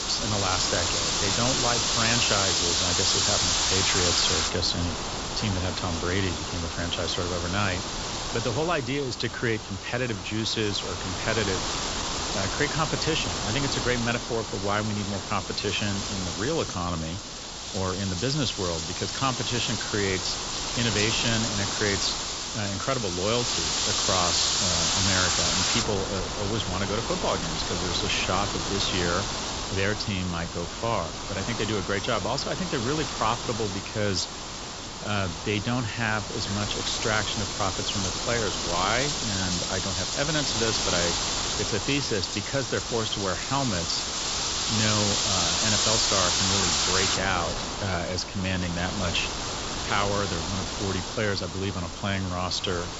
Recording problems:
high frequencies cut off; noticeable; nothing above 8 kHz
wind noise on the microphone; heavy; 2 dB above the speech

